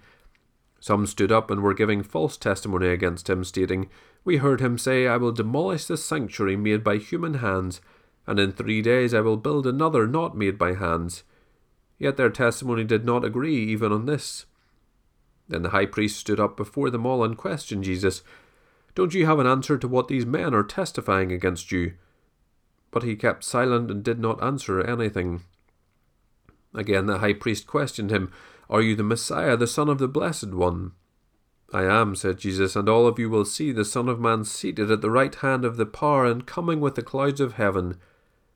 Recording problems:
none

